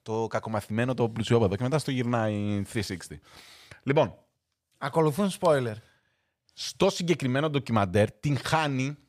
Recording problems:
none

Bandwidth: 15 kHz